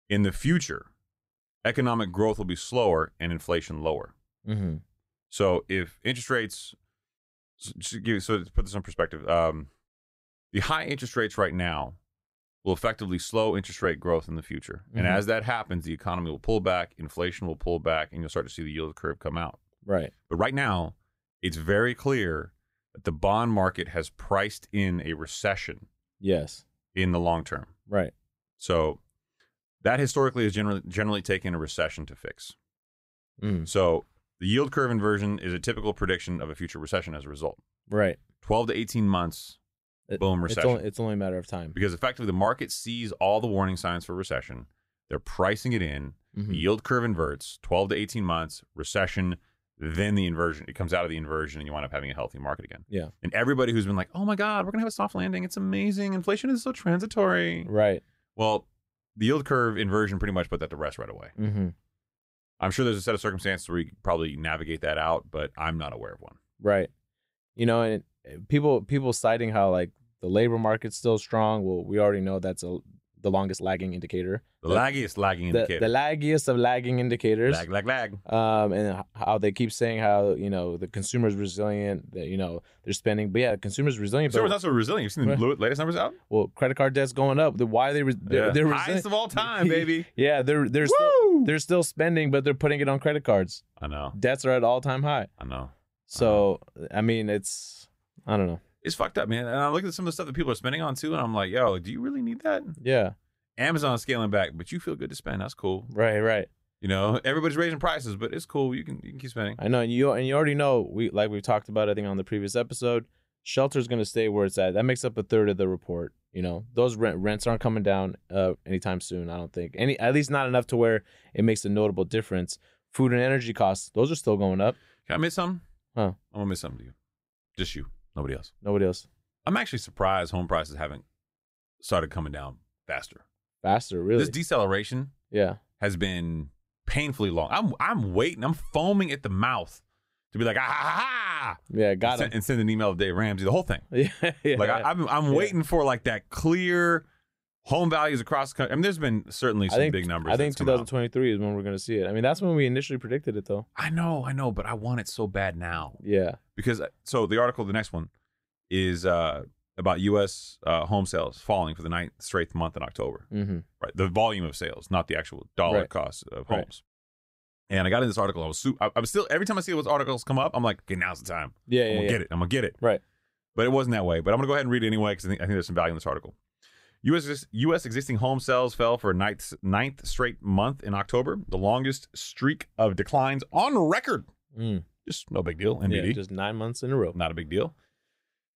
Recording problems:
uneven, jittery; strongly; from 20 s to 1:59

